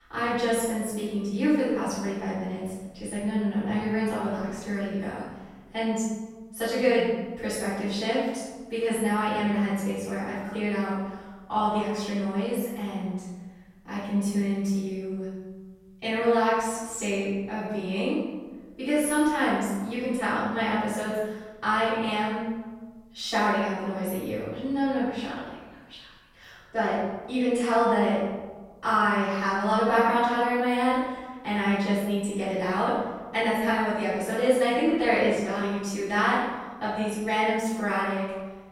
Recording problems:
room echo; strong; dies away in 1.4 s
off-mic speech; far

